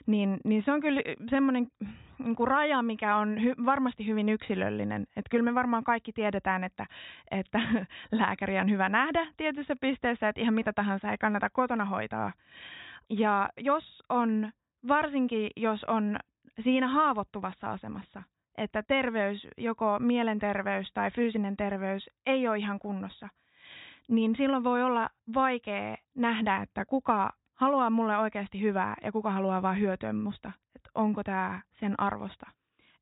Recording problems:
high frequencies cut off; severe; nothing above 4 kHz

